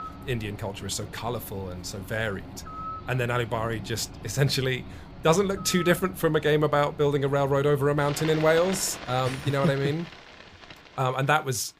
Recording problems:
animal sounds; noticeable; throughout; 15 dB below the speech

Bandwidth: 15 kHz